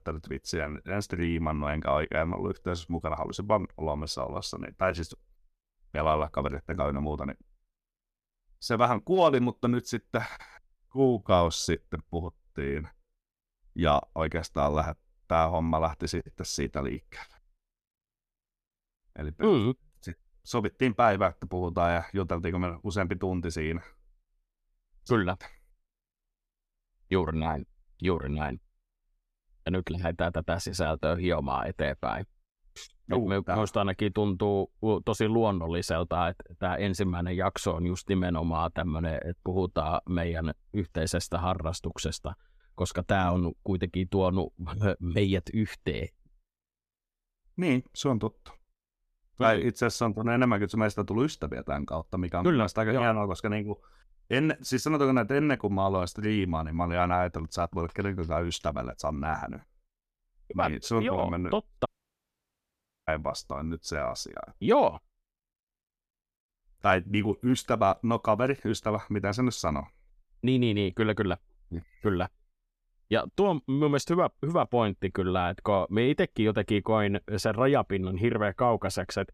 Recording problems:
audio cutting out; at 1:02 for 1 s

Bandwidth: 14.5 kHz